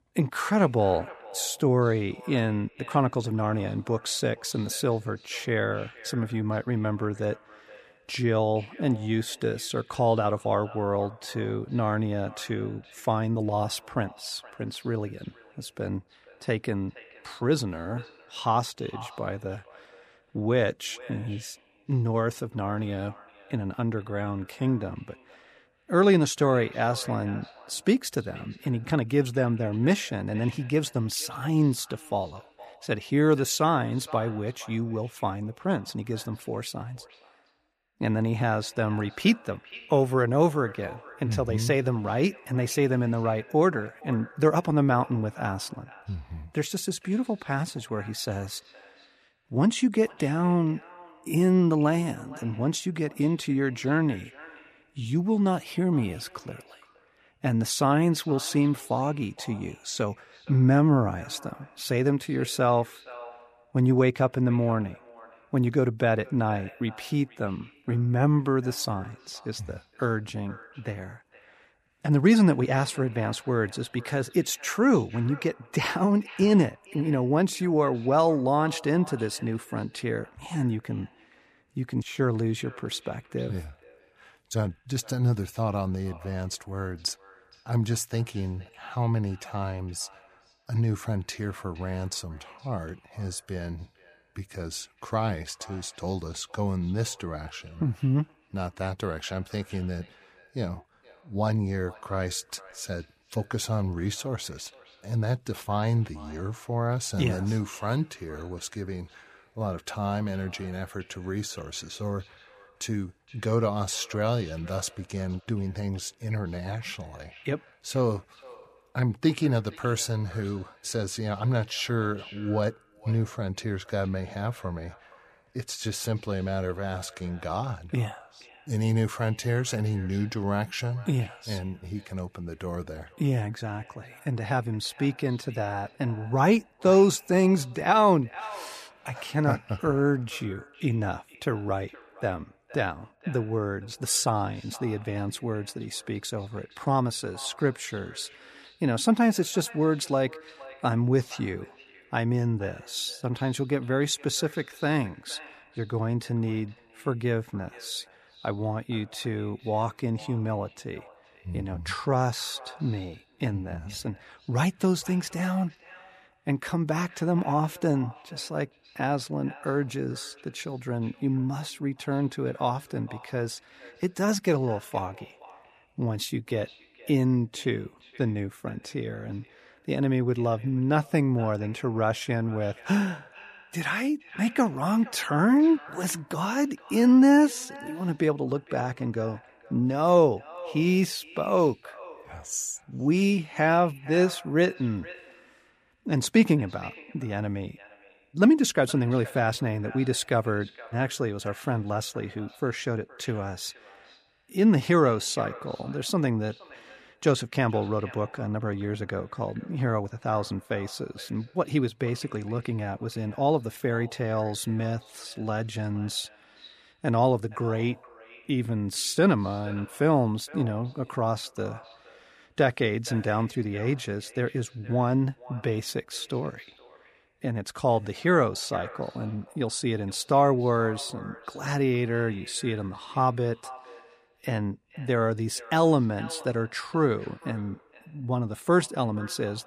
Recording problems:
echo of what is said; faint; throughout; 470 ms later, 20 dB below the speech

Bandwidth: 14.5 kHz